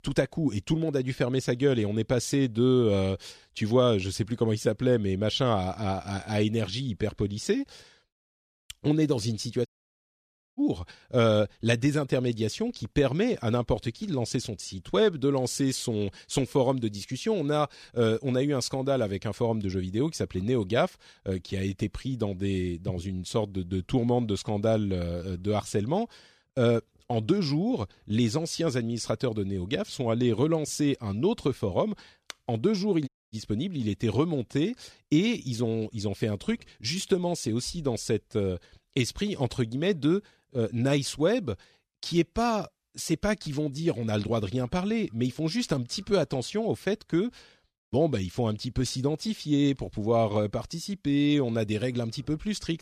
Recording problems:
audio cutting out; at 9.5 s for 1 s and at 33 s

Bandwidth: 14 kHz